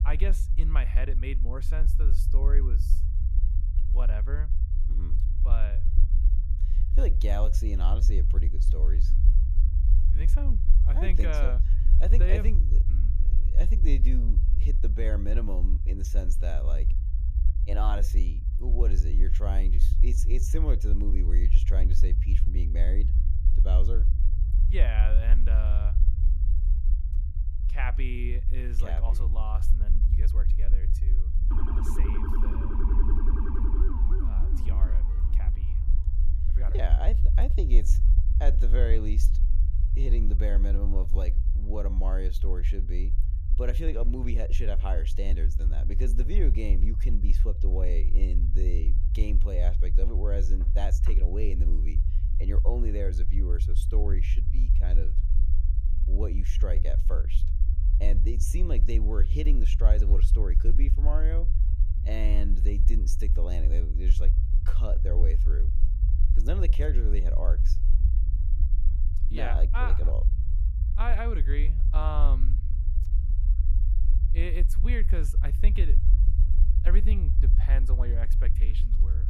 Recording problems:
low rumble; loud; throughout; 8 dB below the speech
siren; loud; from 32 to 36 s; peak 1 dB above the speech

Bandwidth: 15 kHz